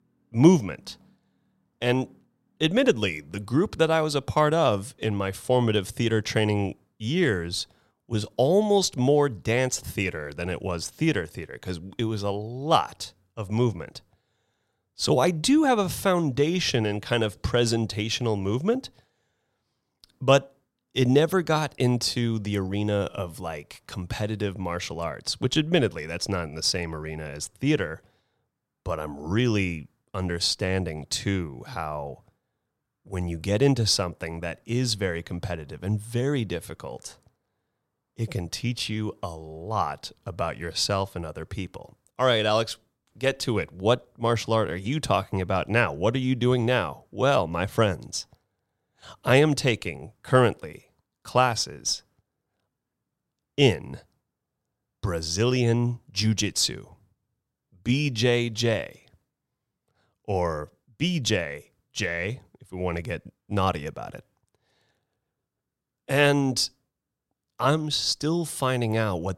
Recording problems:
none

